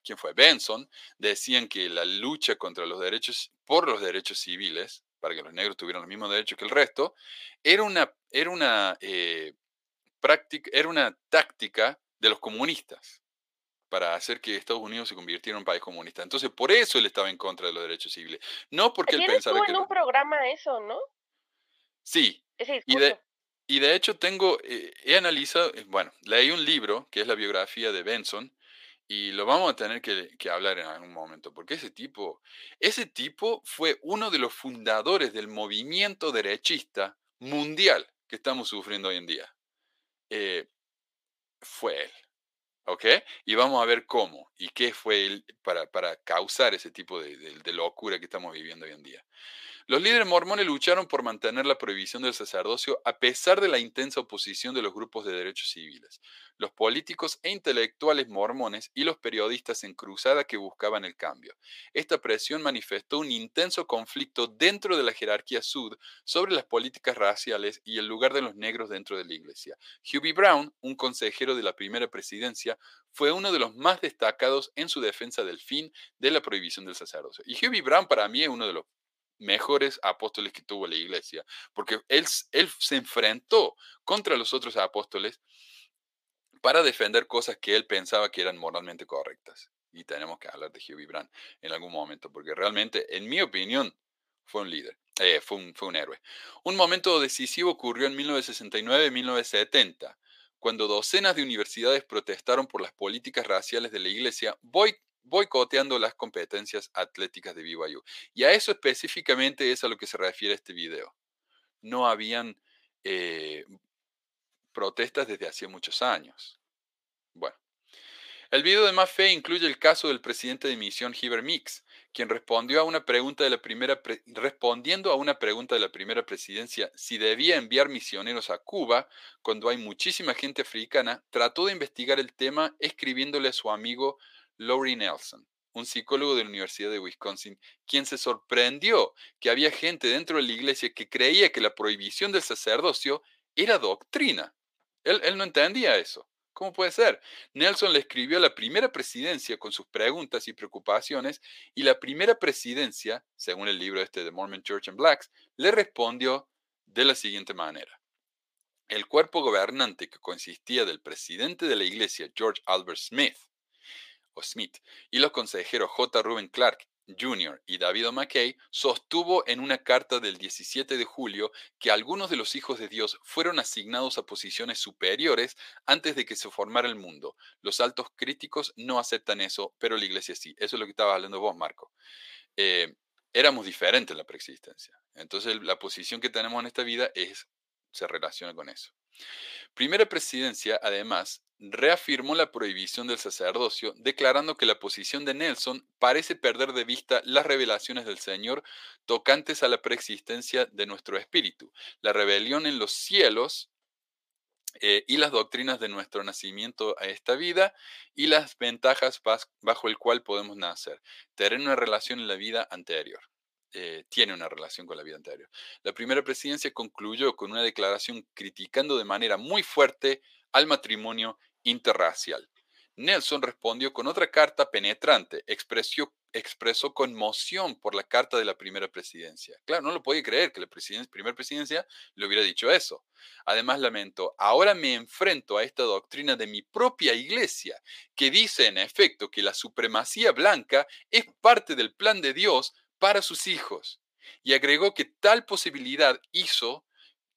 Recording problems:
thin; very; fading below 450 Hz

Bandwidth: 15 kHz